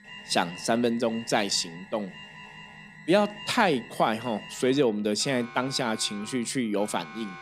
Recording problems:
alarms or sirens; noticeable; throughout; 15 dB below the speech

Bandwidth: 15.5 kHz